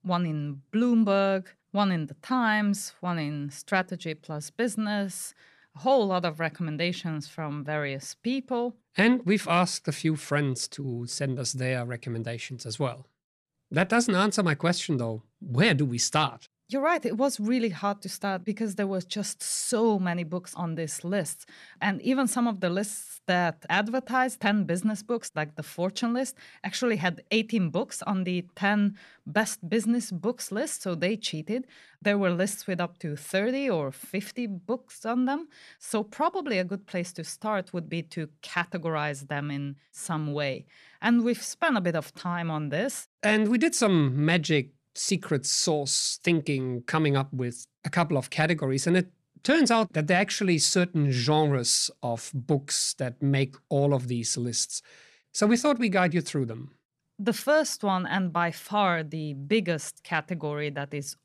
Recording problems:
none

